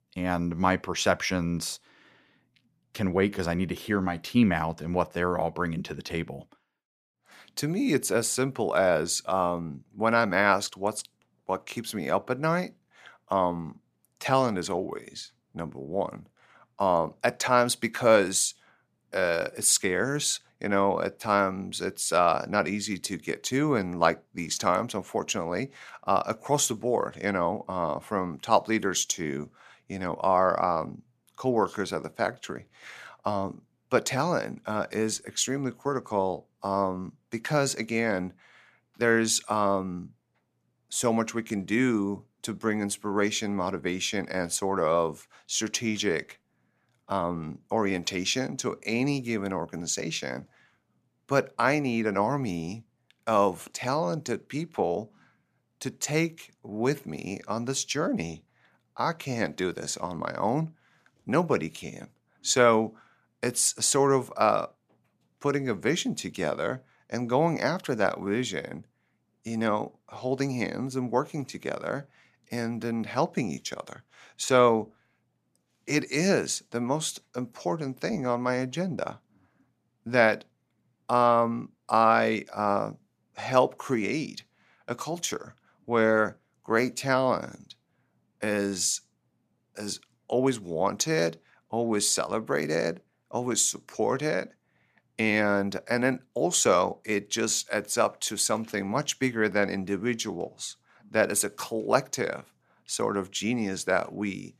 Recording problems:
none

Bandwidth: 14.5 kHz